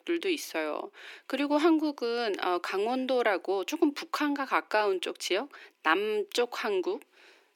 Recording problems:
thin; somewhat; fading below 300 Hz

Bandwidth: 18.5 kHz